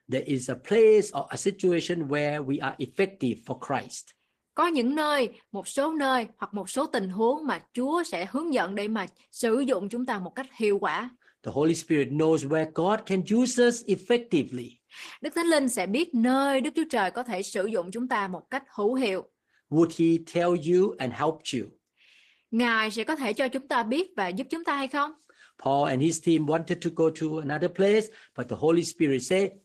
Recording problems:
garbled, watery; slightly

